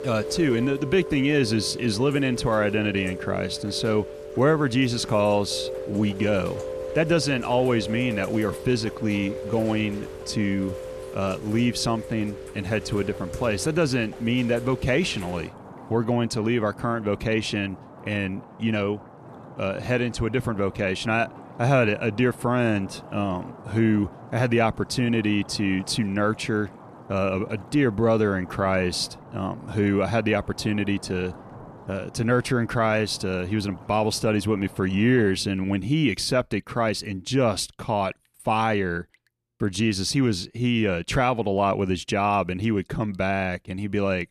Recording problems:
rain or running water; noticeable; throughout; 15 dB below the speech

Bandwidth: 14 kHz